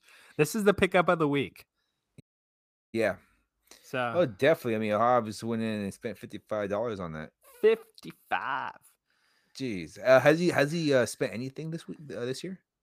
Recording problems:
audio cutting out; at 2 s for 0.5 s

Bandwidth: 15 kHz